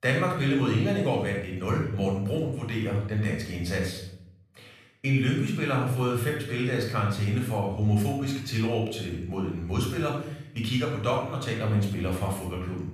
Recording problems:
room echo; noticeable; dies away in 0.6 s
off-mic speech; somewhat distant

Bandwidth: 14.5 kHz